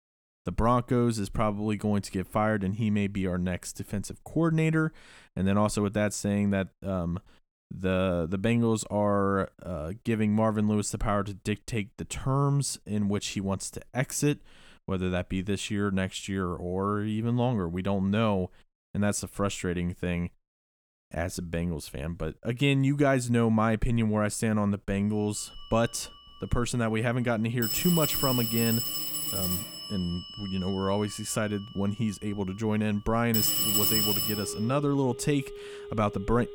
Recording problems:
alarms or sirens; loud; from 25 s on; 1 dB below the speech

